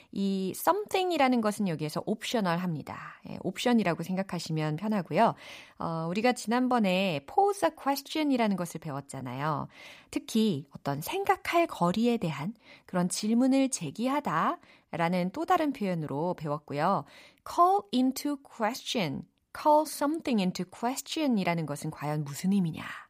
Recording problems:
none

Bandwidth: 15 kHz